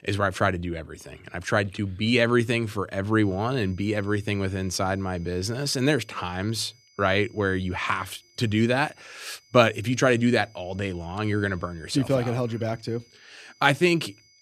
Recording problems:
high-pitched whine; faint; from 3 s on; 5 kHz, 30 dB below the speech

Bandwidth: 14.5 kHz